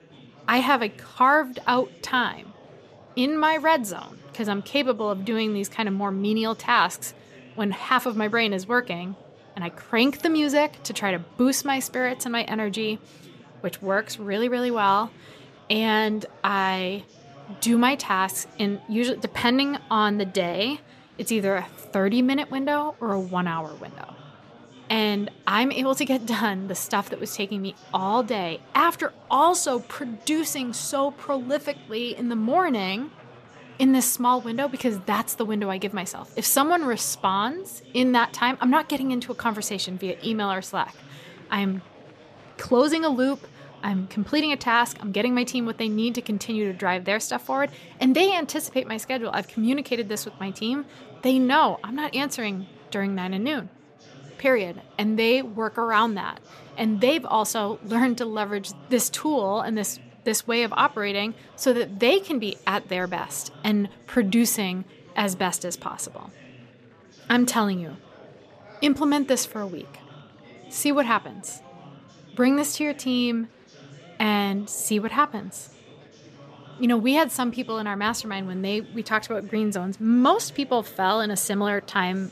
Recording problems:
chatter from many people; faint; throughout; 25 dB below the speech

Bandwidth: 14.5 kHz